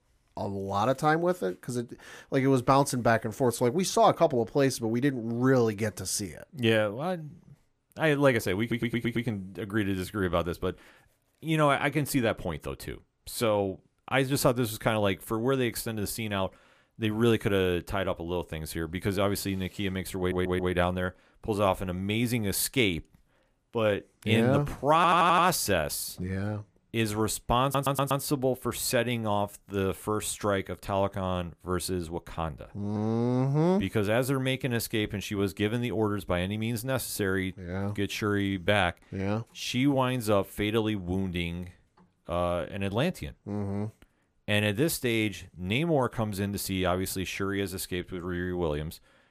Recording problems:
audio stuttering; 4 times, first at 8.5 s

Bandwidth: 15 kHz